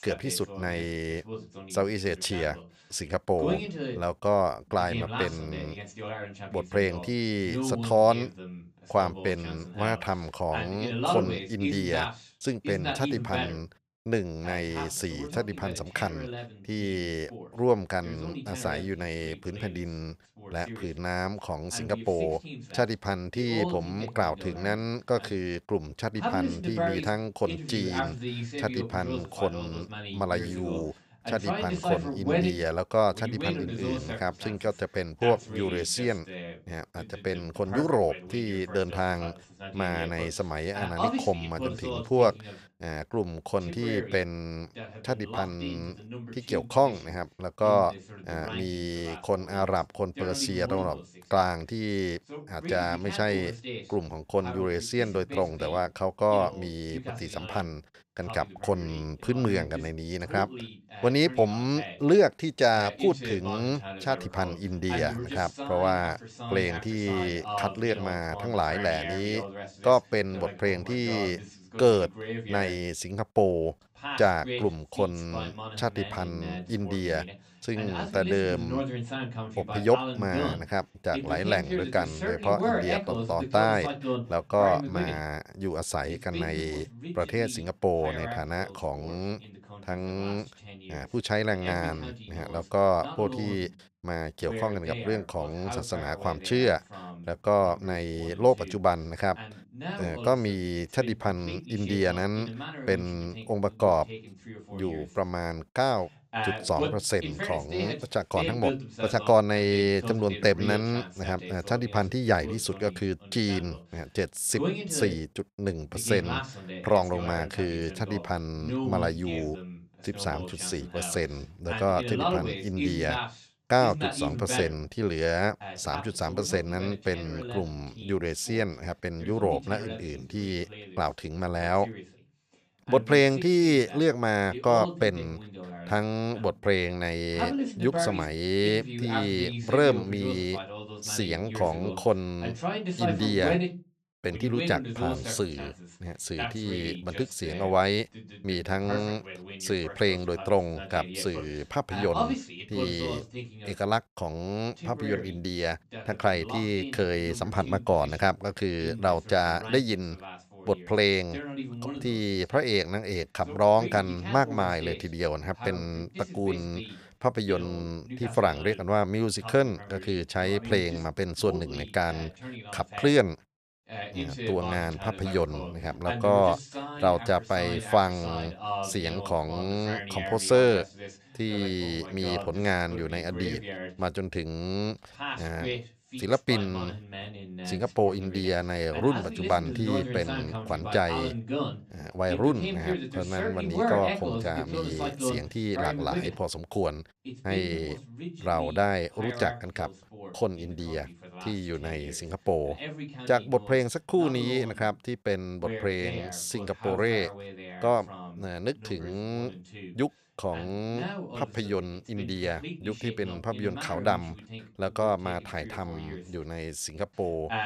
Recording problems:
voice in the background; loud; throughout; 8 dB below the speech

